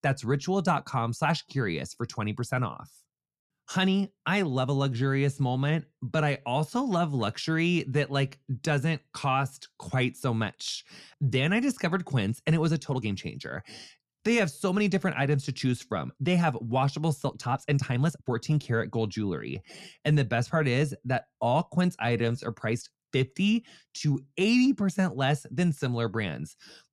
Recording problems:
uneven, jittery; strongly; from 3.5 to 25 s

